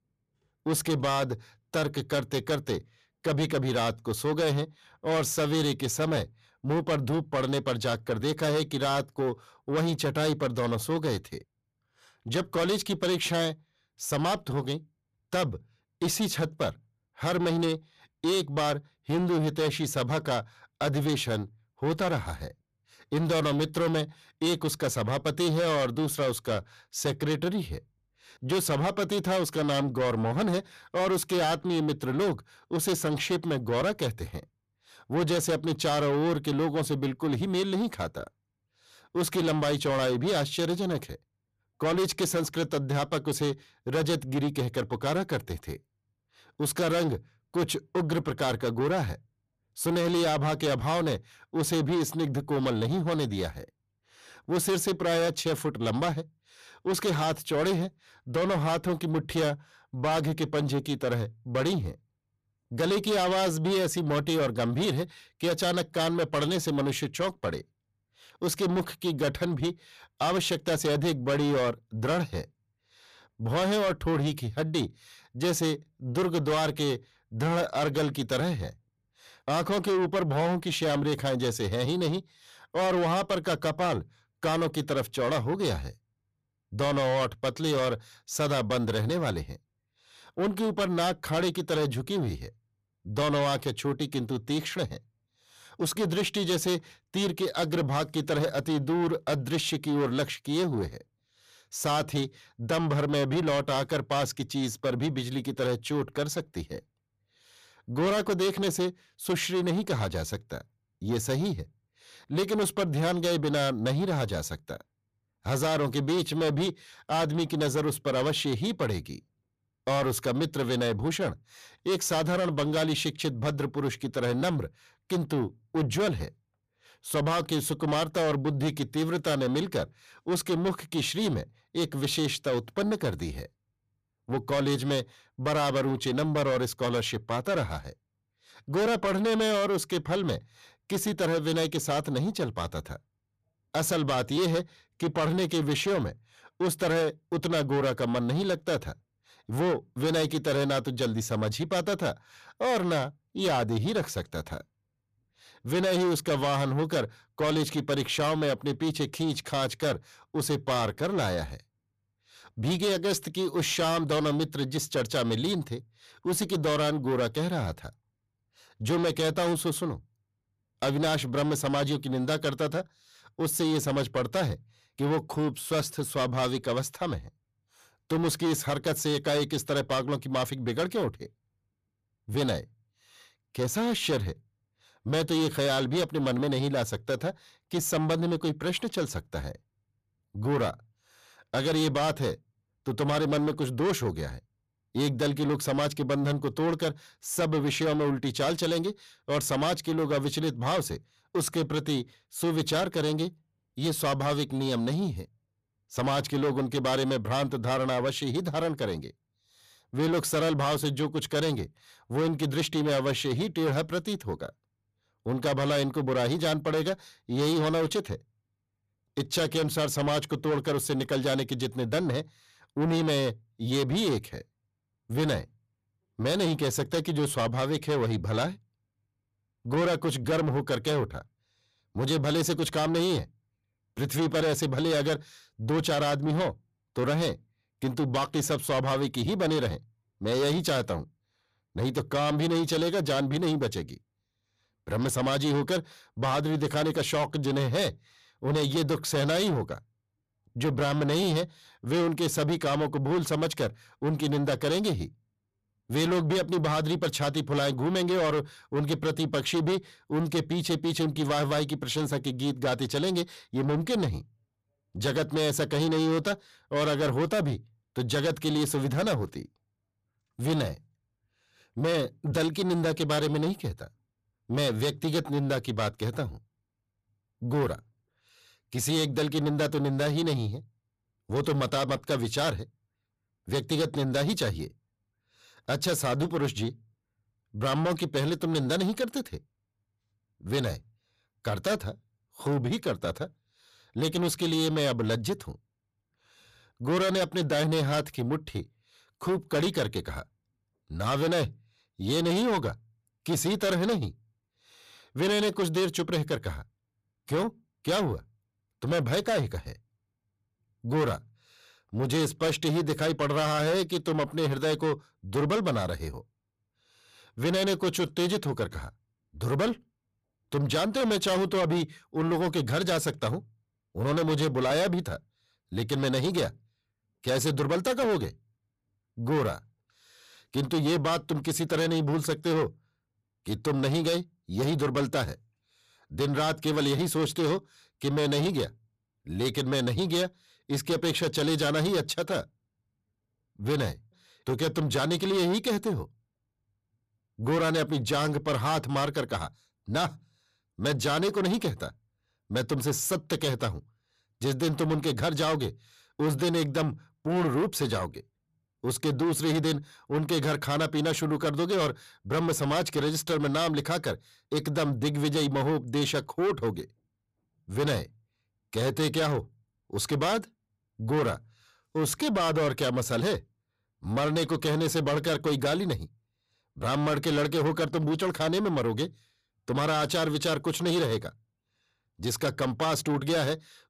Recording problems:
distortion; heavy; 8 dB below the speech

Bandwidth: 14.5 kHz